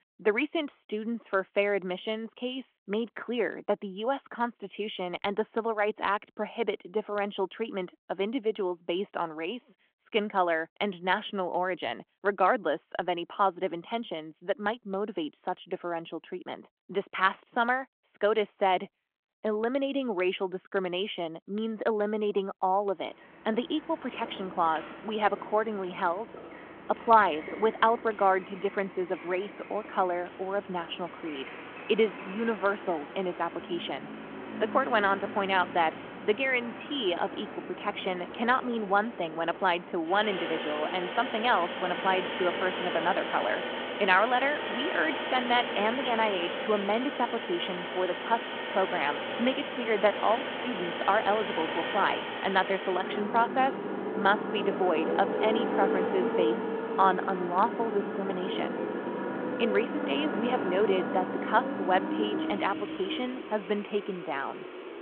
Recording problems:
phone-call audio
traffic noise; loud; from 23 s on; 5 dB below the speech

